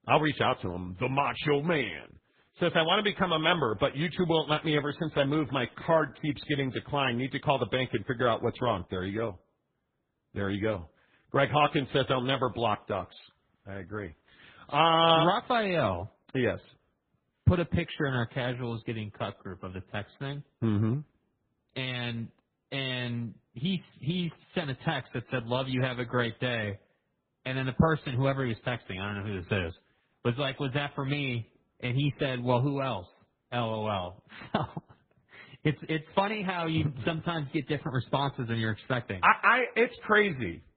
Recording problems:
garbled, watery; badly
high frequencies cut off; severe; nothing above 3.5 kHz

